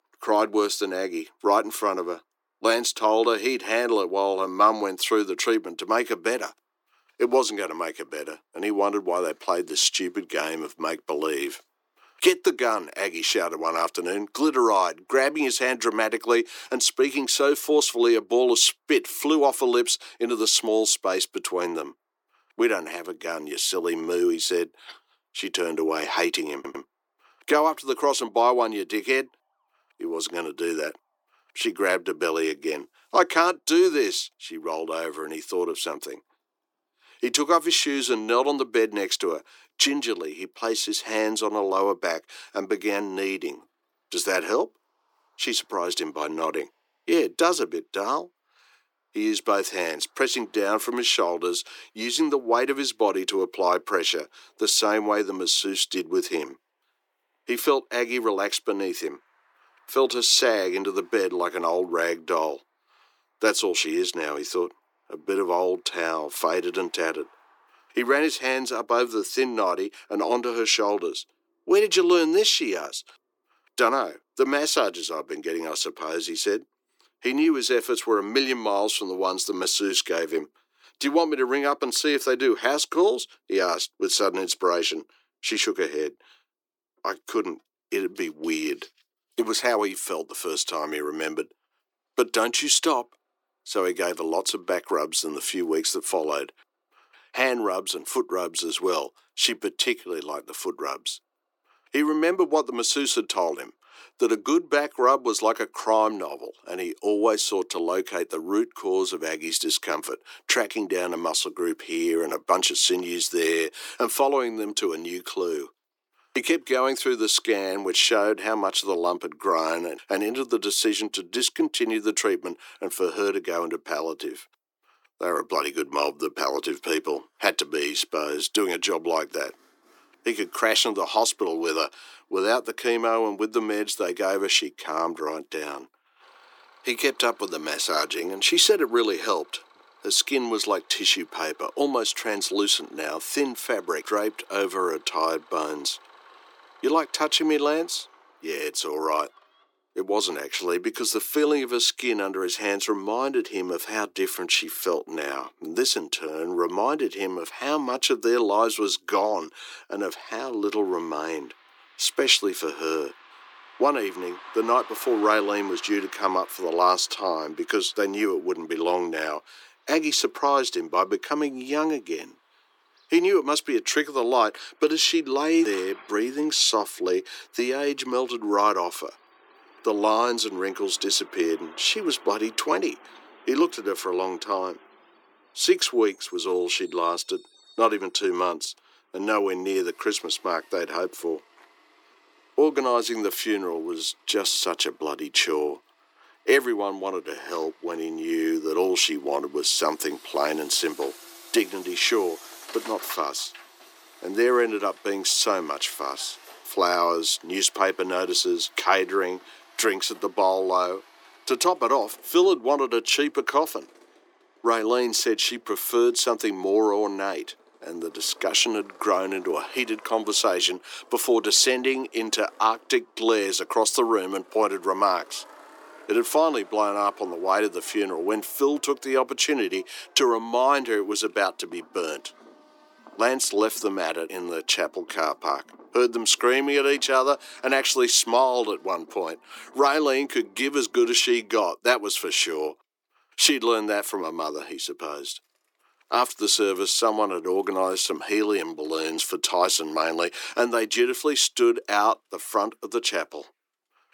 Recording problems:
thin; very; fading below 350 Hz
traffic noise; faint; throughout; 25 dB below the speech
audio stuttering; at 27 s

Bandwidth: 18.5 kHz